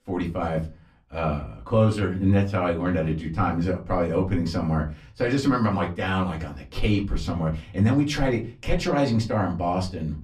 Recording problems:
off-mic speech; far
room echo; very slight; dies away in 0.3 s

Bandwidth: 14.5 kHz